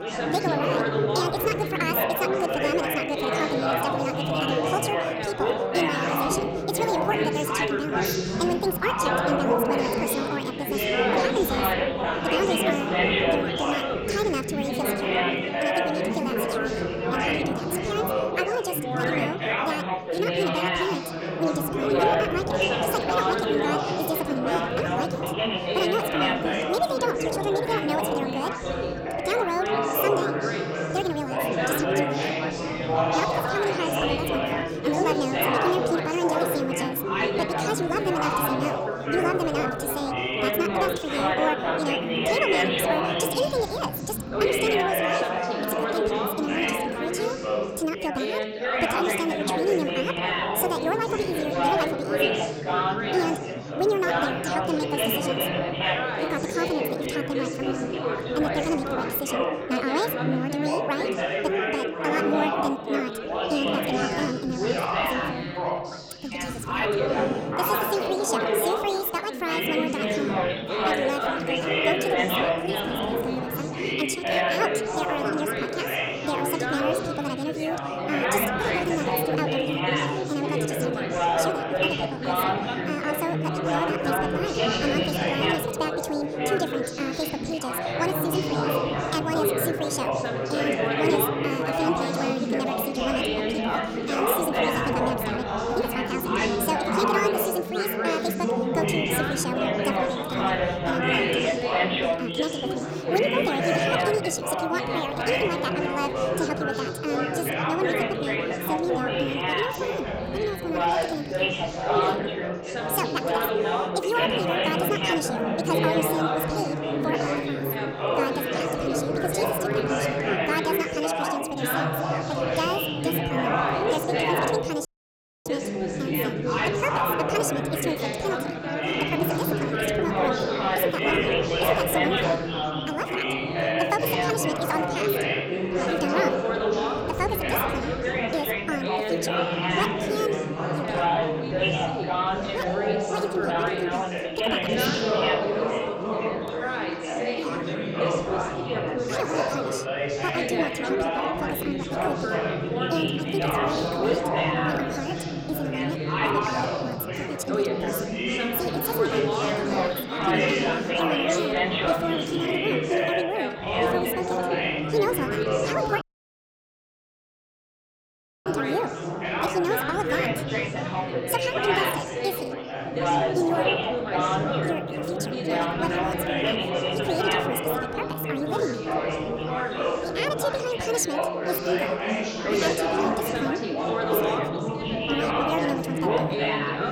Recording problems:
wrong speed and pitch; too fast and too high; 1.6 times normal speed
chatter from many people; very loud; throughout; 4 dB above the speech
audio cutting out; at 2:05 for 0.5 s and at 2:46 for 2.5 s

